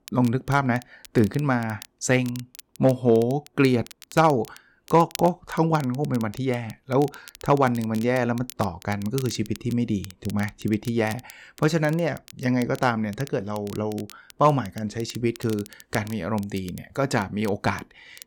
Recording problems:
crackle, like an old record; noticeable; 20 dB below the speech

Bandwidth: 17.5 kHz